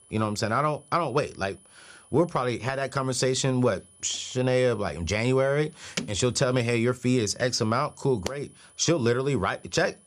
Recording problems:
high-pitched whine; faint; throughout; 10 kHz, 25 dB below the speech

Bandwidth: 14.5 kHz